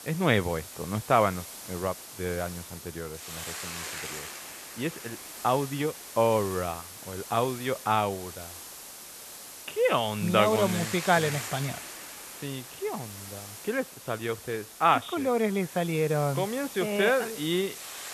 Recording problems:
high frequencies cut off; severe; nothing above 4 kHz
hiss; noticeable; throughout; 10 dB below the speech

